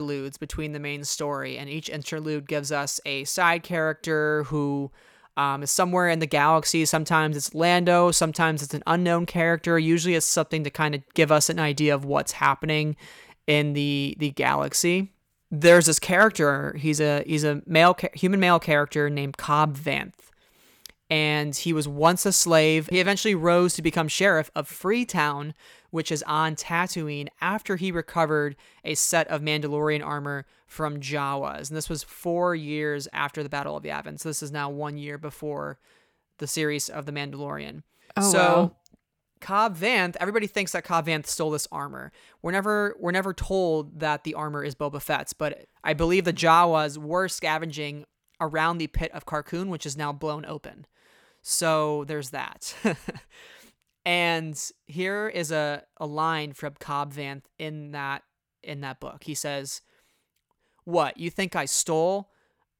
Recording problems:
abrupt cut into speech; at the start

